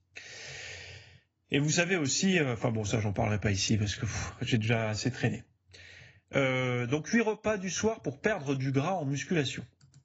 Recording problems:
garbled, watery; badly; nothing above 7 kHz

